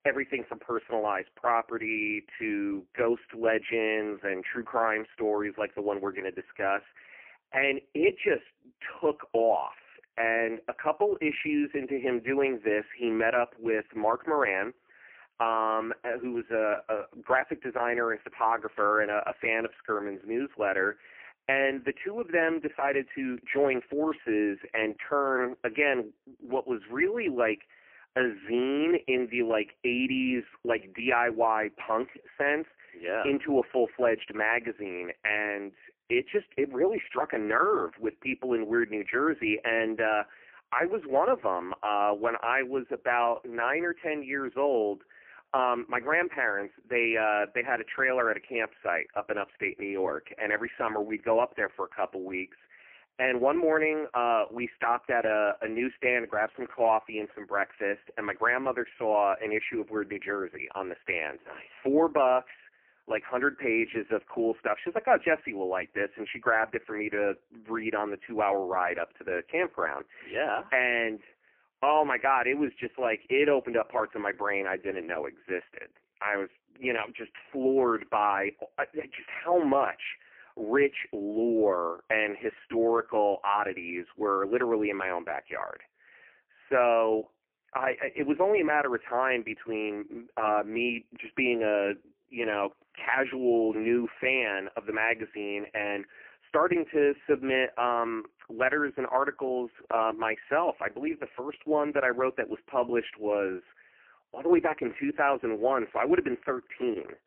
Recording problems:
phone-call audio; poor line; nothing above 3 kHz

